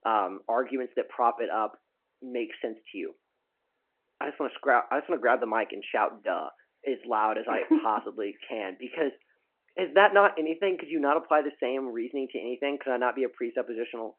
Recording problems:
phone-call audio

